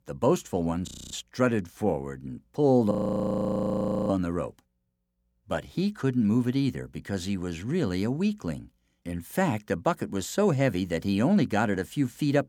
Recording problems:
audio freezing; at 1 s and at 3 s for 1 s

